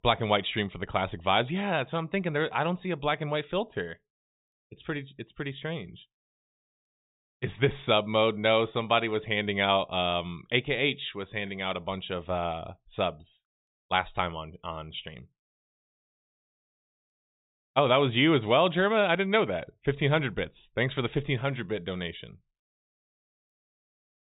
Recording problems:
high frequencies cut off; severe; nothing above 4 kHz

